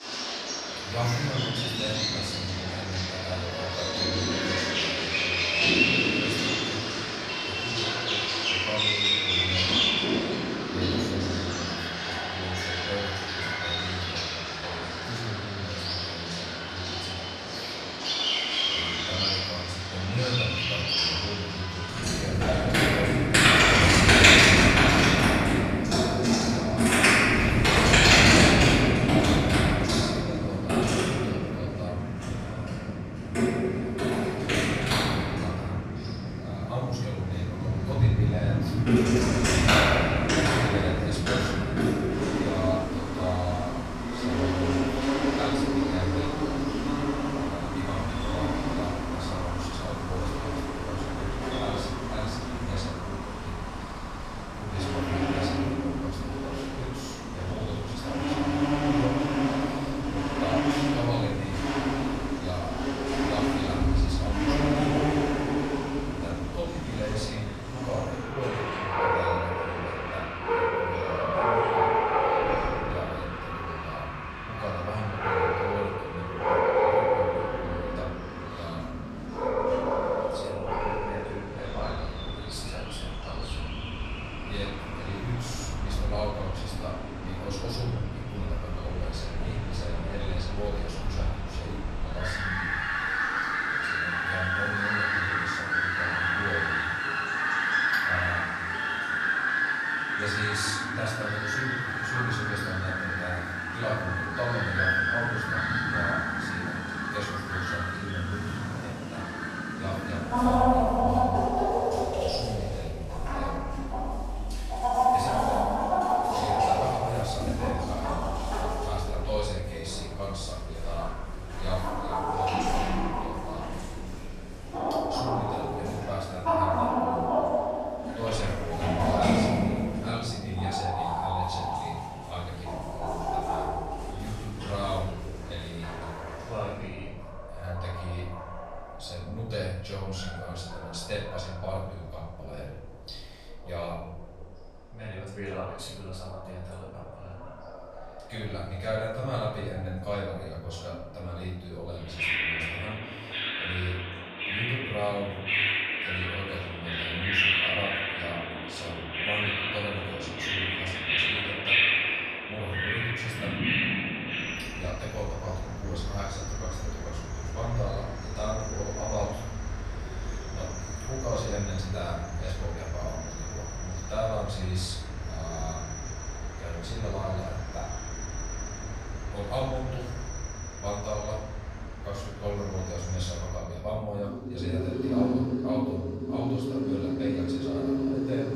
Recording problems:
off-mic speech; far
room echo; noticeable; dies away in 0.8 s
animal sounds; very loud; throughout; 9 dB above the speech
voice in the background; noticeable; throughout; 20 dB below the speech

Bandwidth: 15 kHz